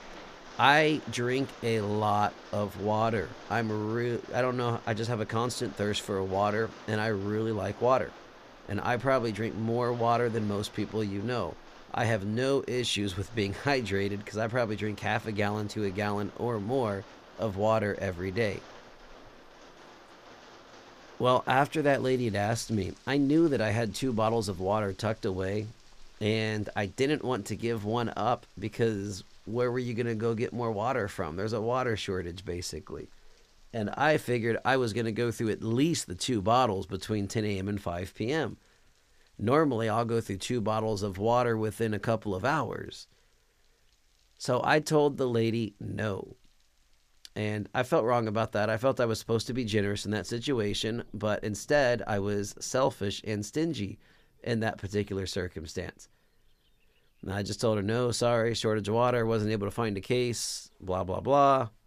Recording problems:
rain or running water; faint; throughout; 20 dB below the speech

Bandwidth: 14.5 kHz